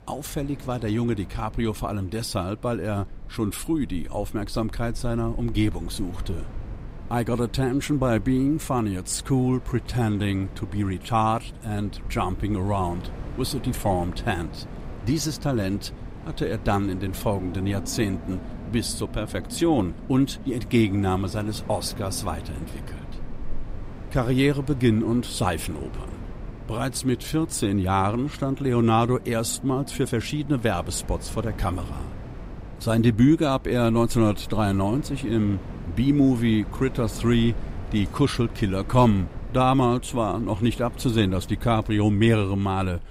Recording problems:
wind in the background; noticeable; throughout; 15 dB below the speech

